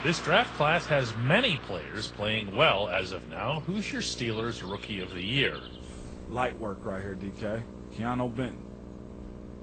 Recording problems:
garbled, watery; slightly; nothing above 8.5 kHz
traffic noise; noticeable; throughout; 15 dB below the speech
electrical hum; faint; throughout; 60 Hz, 20 dB below the speech

